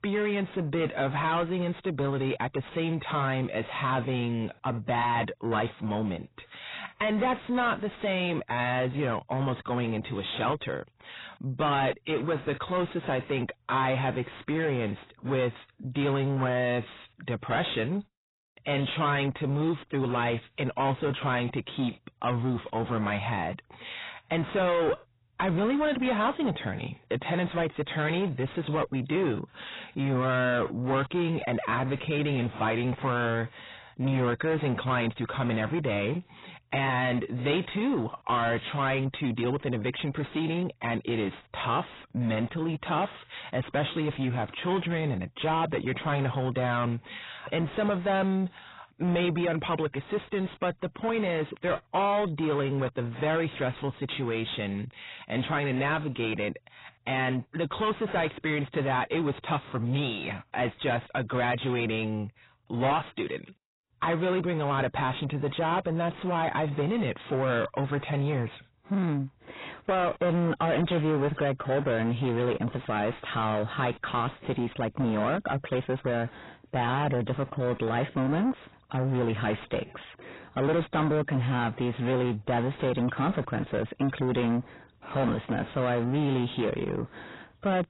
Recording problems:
distortion; heavy; 6 dB below the speech
garbled, watery; badly; nothing above 4 kHz

